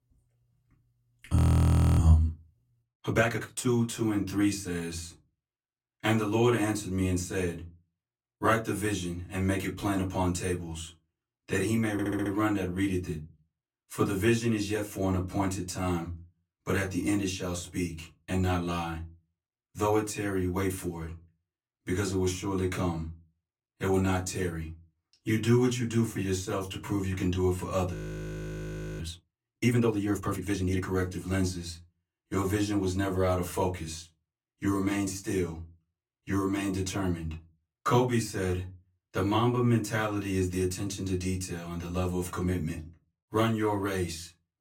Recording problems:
off-mic speech; far
room echo; very slight; dies away in 0.3 s
audio freezing; at 1.5 s for 0.5 s and at 28 s for 1 s
audio stuttering; at 12 s

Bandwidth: 16.5 kHz